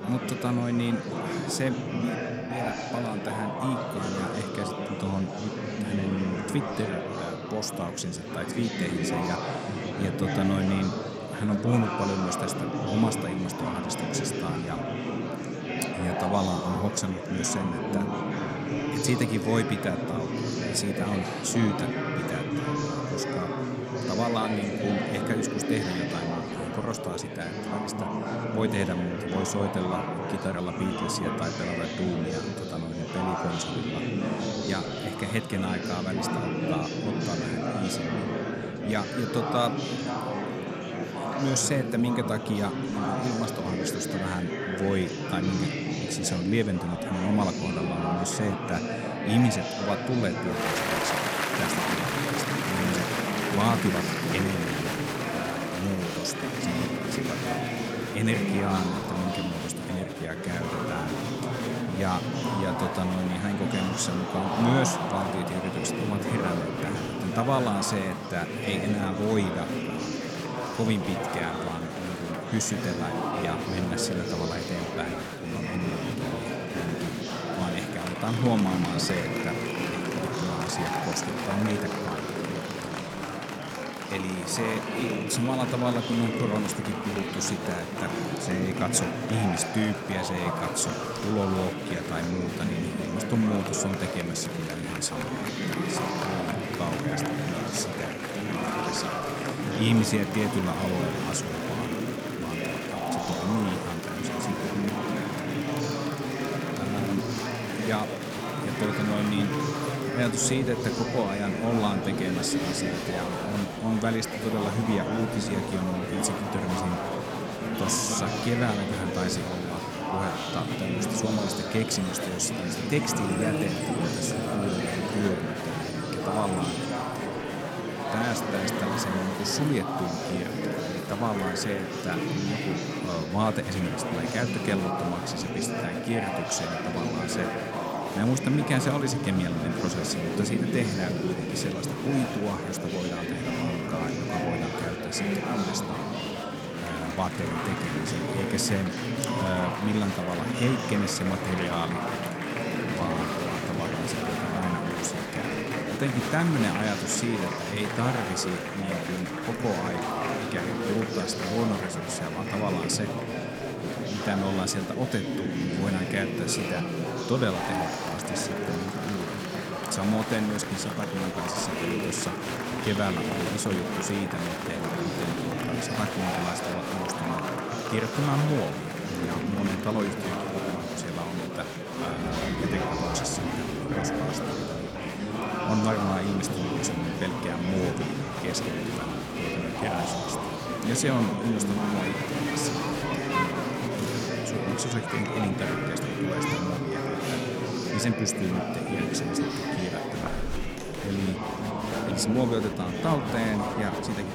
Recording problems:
murmuring crowd; very loud; throughout; as loud as the speech

